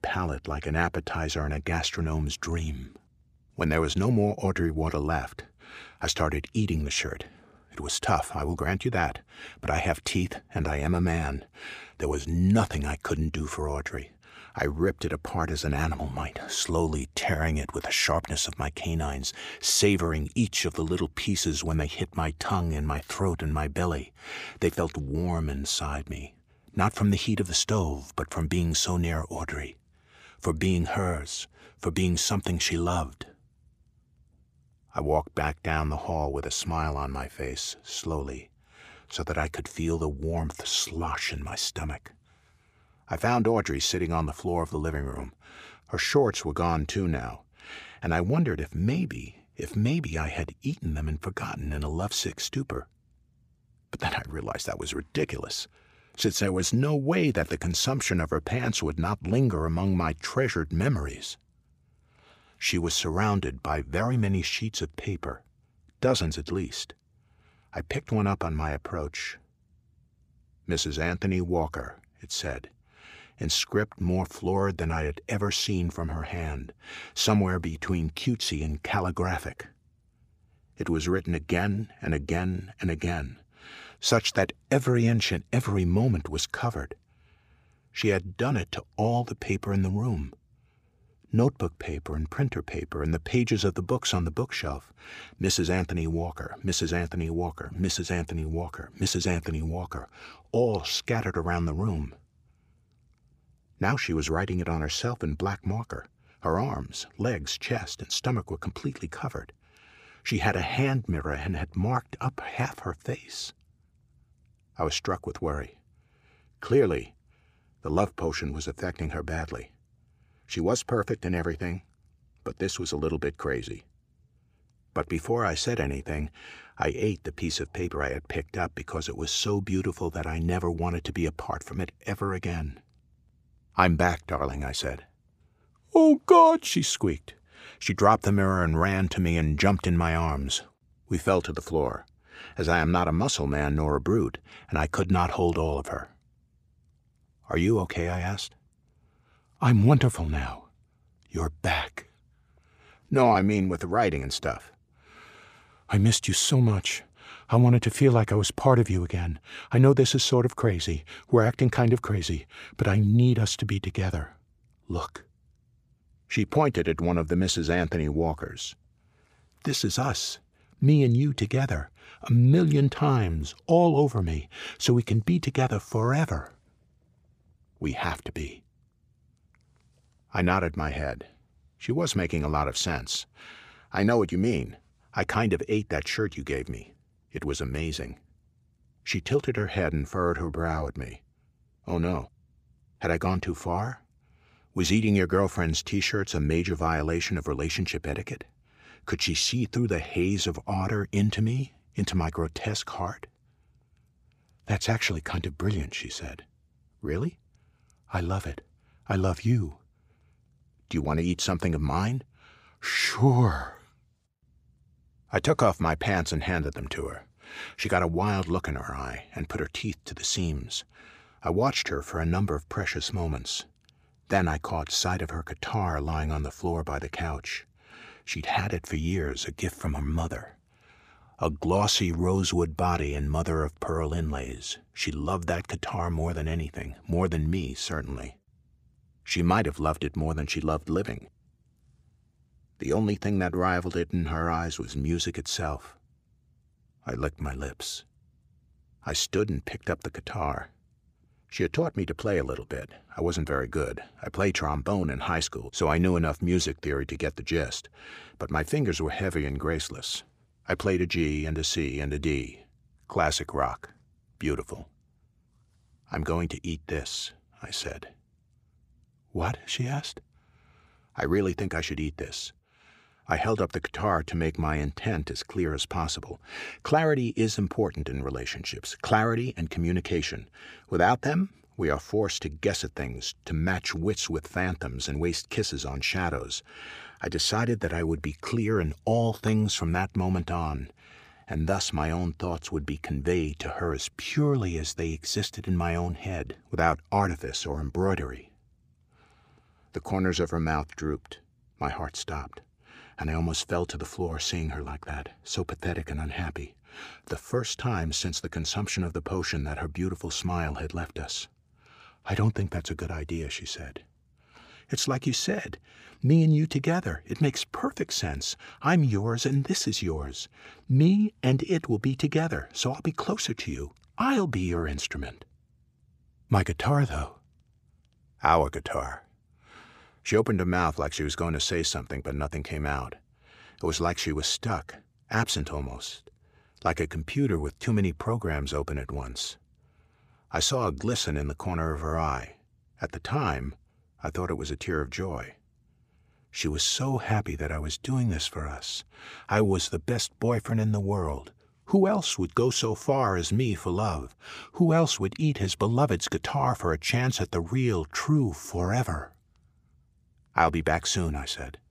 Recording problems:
uneven, jittery; slightly; from 2:08 to 2:37

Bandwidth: 15 kHz